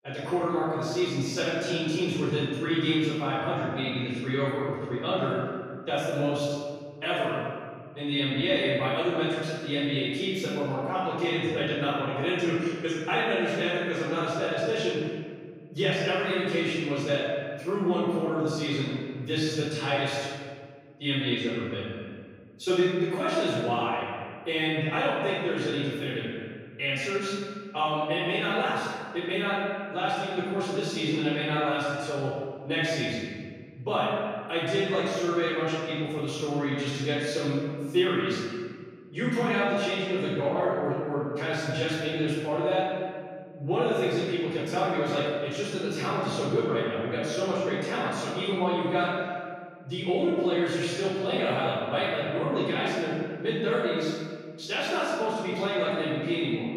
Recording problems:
room echo; strong; dies away in 1.7 s
off-mic speech; far
echo of what is said; faint; throughout; 200 ms later, 20 dB below the speech

